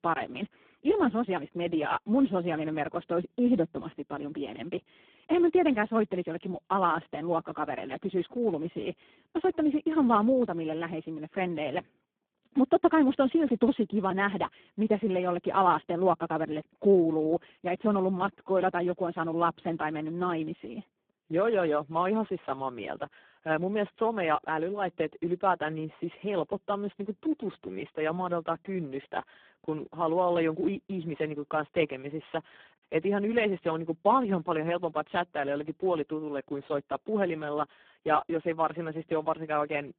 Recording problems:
phone-call audio; poor line

